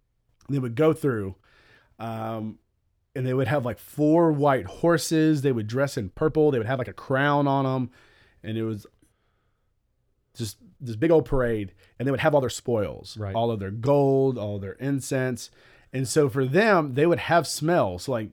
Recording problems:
uneven, jittery; strongly; from 2 to 17 s

